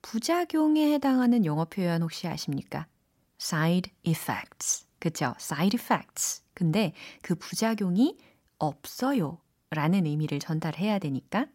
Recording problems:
none

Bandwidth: 16 kHz